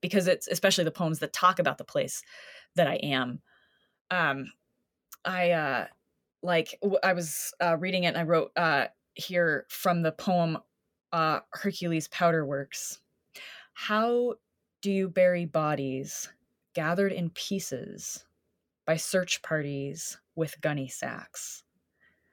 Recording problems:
none

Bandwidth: 18 kHz